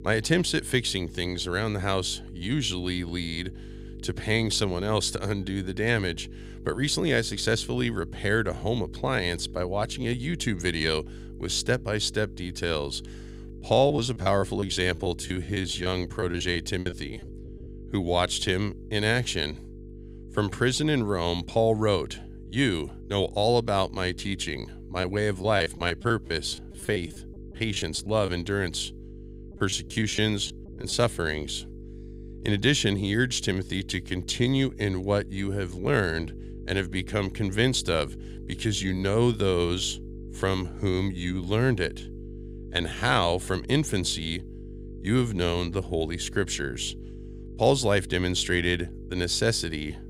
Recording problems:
electrical hum; faint; throughout; 50 Hz, 20 dB below the speech
choppy; very; from 14 to 17 s, from 25 to 28 s and from 30 to 31 s; 16% of the speech affected

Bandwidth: 15.5 kHz